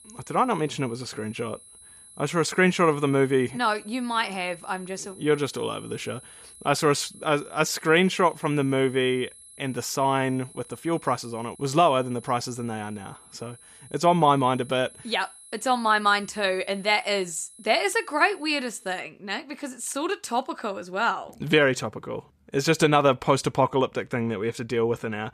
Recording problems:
high-pitched whine; faint; until 19 s; 11 kHz, 20 dB below the speech

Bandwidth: 14.5 kHz